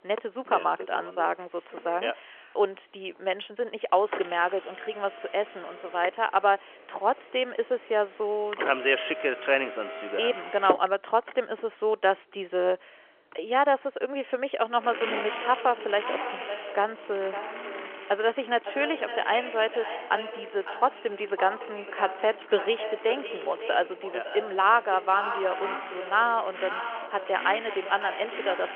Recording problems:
echo of what is said; strong; from 15 s on; 560 ms later, 10 dB below the speech
phone-call audio; nothing above 3 kHz
traffic noise; noticeable; throughout; 10 dB below the speech

